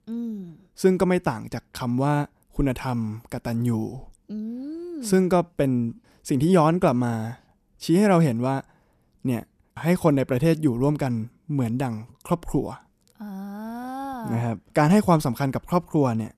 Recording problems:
none

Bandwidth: 14 kHz